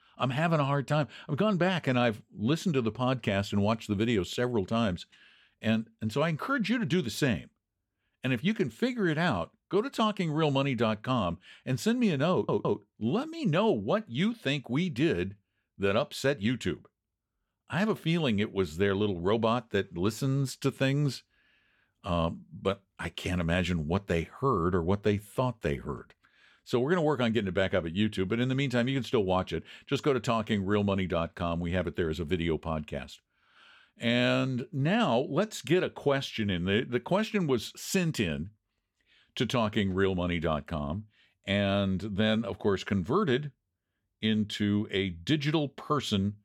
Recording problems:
audio stuttering; at 12 s

